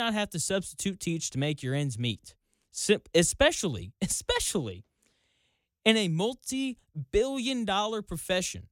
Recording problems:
abrupt cut into speech; at the start

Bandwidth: 17.5 kHz